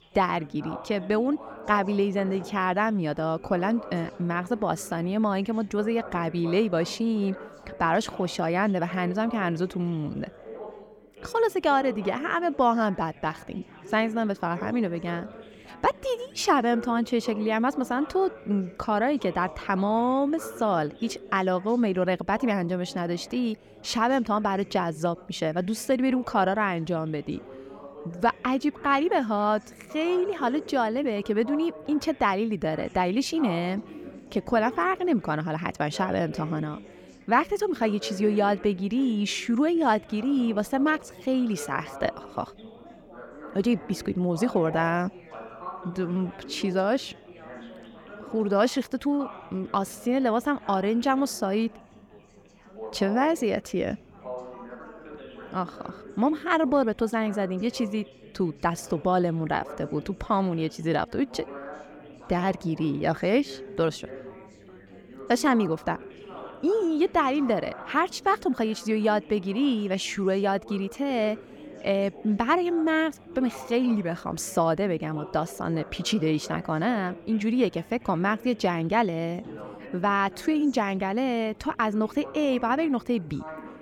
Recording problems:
background chatter; noticeable; throughout; 4 voices, 15 dB below the speech

